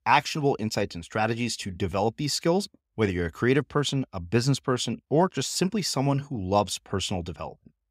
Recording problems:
none

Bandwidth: 15.5 kHz